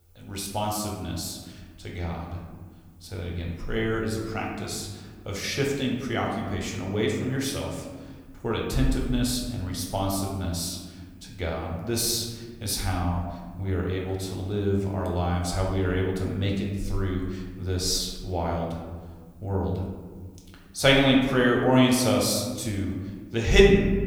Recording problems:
room echo; noticeable; dies away in 1.4 s
off-mic speech; somewhat distant

